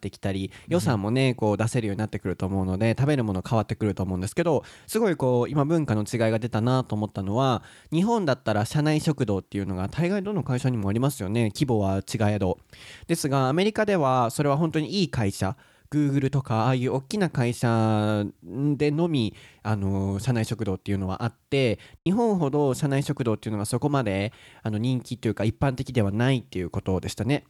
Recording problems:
choppy; occasionally; at 22 s; 2% of the speech affected

